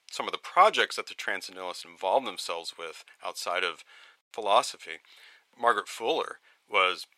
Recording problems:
thin; very; fading below 800 Hz

